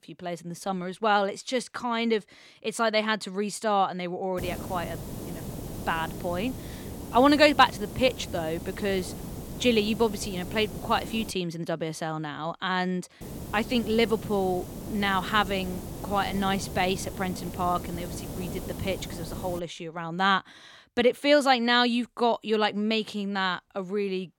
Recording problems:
hiss; noticeable; from 4.5 to 11 s and from 13 to 20 s; 10 dB below the speech

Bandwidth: 17 kHz